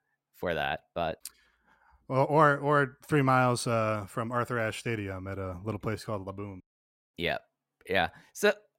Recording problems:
none

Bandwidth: 16 kHz